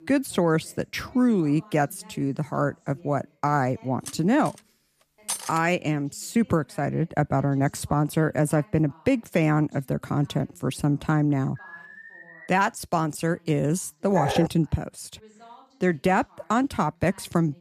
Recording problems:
voice in the background; faint; throughout; 30 dB below the speech
clattering dishes; noticeable; from 4 to 5.5 s; peak 5 dB below the speech
alarm; faint; at 12 s; peak 20 dB below the speech
dog barking; noticeable; at 14 s; peak 2 dB below the speech

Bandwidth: 14.5 kHz